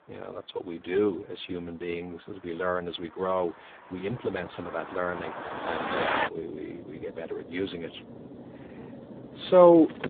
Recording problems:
phone-call audio; poor line; nothing above 3.5 kHz
traffic noise; loud; throughout; 9 dB below the speech

